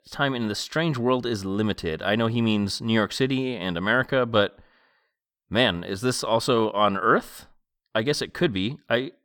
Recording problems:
none

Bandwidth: 18.5 kHz